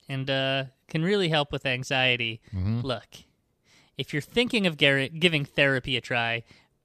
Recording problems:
none

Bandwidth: 14.5 kHz